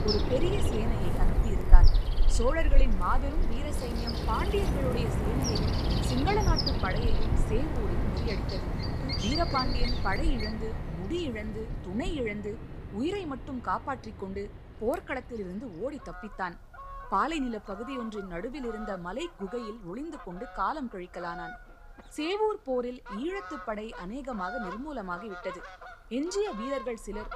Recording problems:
animal sounds; very loud; throughout; 3 dB above the speech

